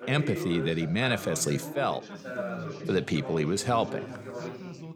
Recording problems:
chatter from many people; loud; throughout; 9 dB below the speech

